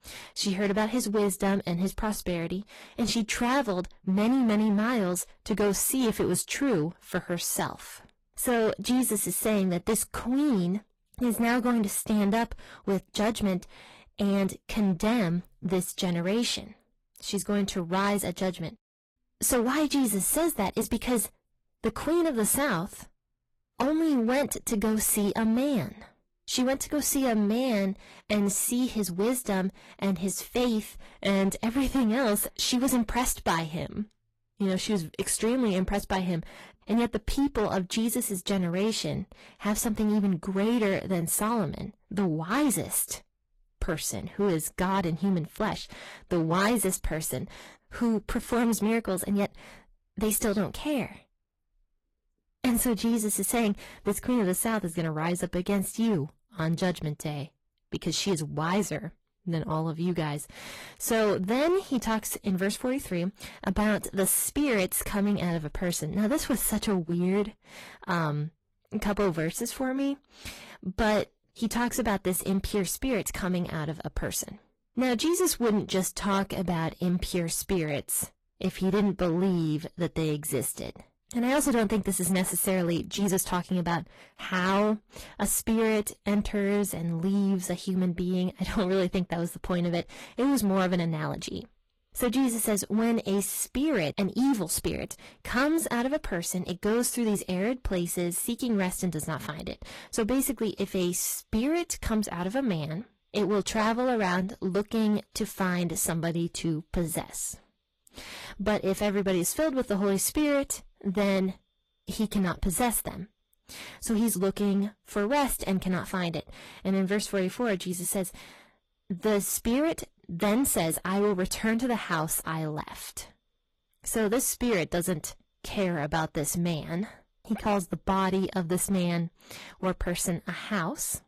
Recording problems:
distortion; slight; 8% of the sound clipped
garbled, watery; slightly; nothing above 13 kHz

